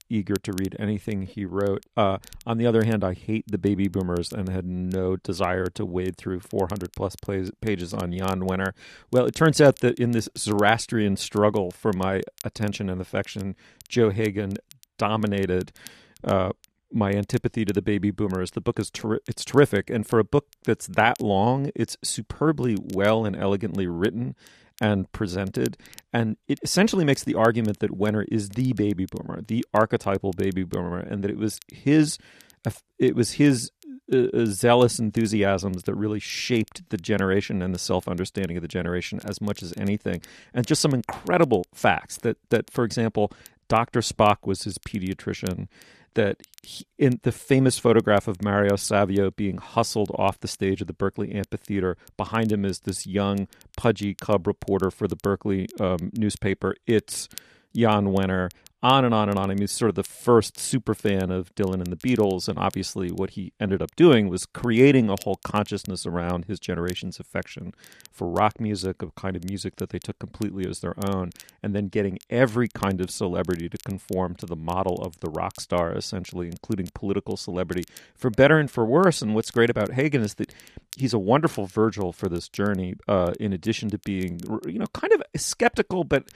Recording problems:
crackle, like an old record; faint; 25 dB below the speech

